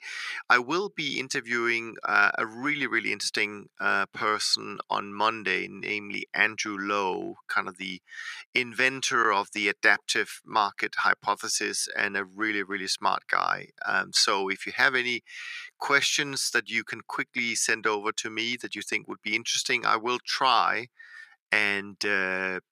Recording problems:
thin; very; fading below 650 Hz

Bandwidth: 14.5 kHz